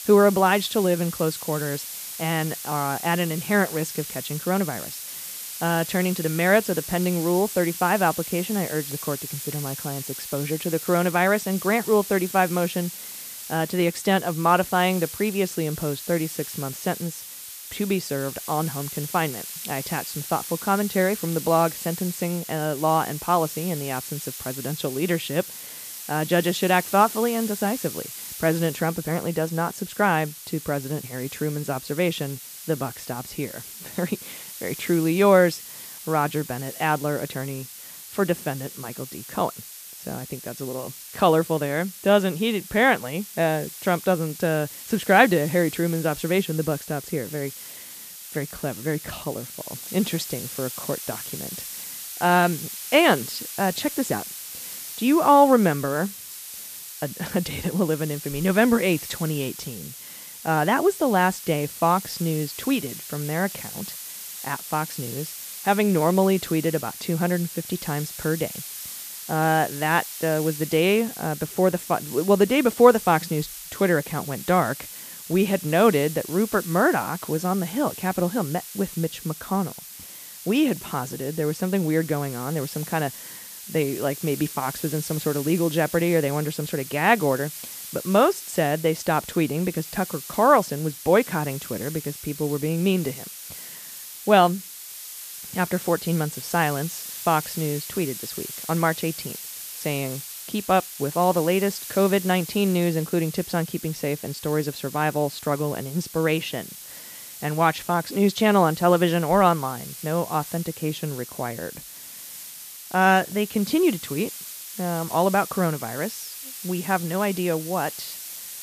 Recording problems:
hiss; noticeable; throughout; 10 dB below the speech

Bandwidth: 14.5 kHz